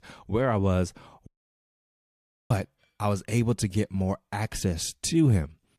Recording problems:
audio cutting out; at 1.5 s for 1 s

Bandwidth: 14.5 kHz